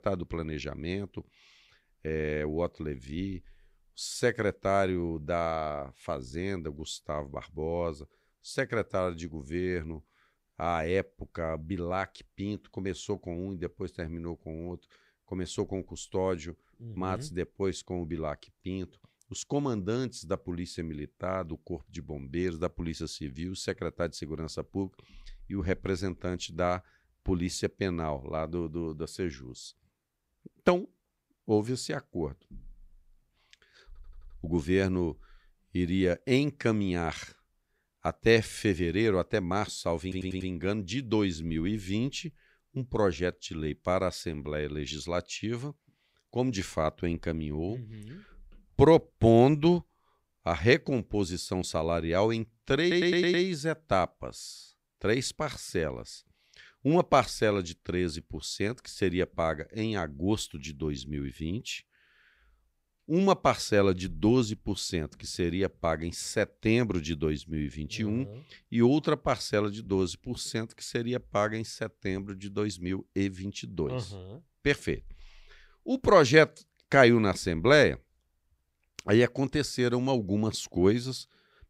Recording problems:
audio stuttering; at 34 s, at 40 s and at 53 s

